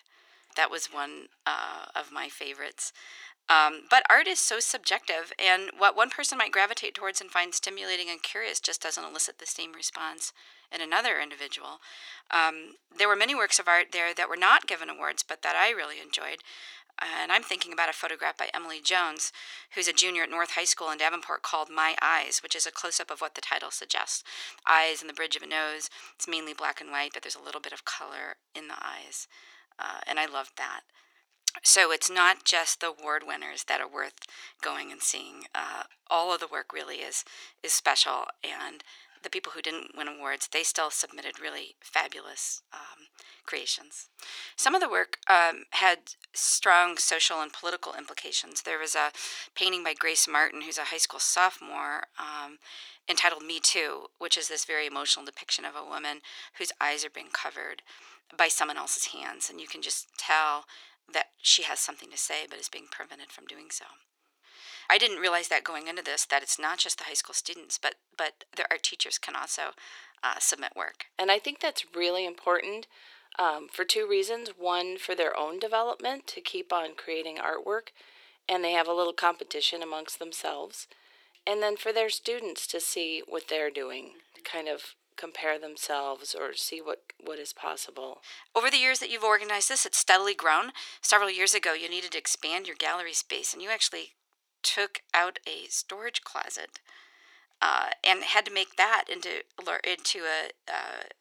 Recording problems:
thin; very; fading below 400 Hz

